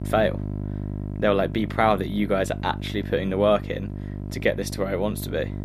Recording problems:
electrical hum; noticeable; throughout; 50 Hz, 15 dB below the speech

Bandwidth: 14 kHz